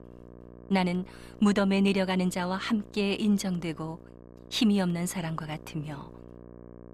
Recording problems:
electrical hum; faint; throughout; 60 Hz, 20 dB below the speech

